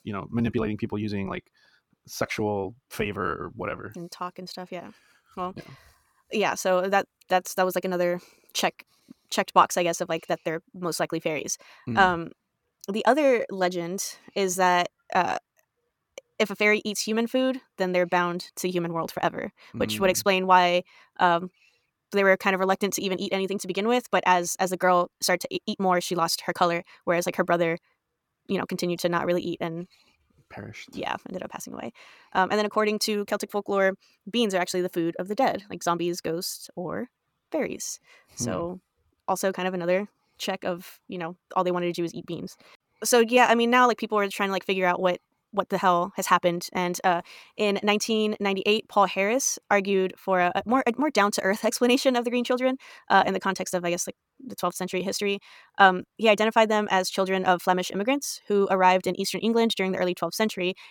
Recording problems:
wrong speed, natural pitch; too fast; 1.5 times normal speed

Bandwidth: 17.5 kHz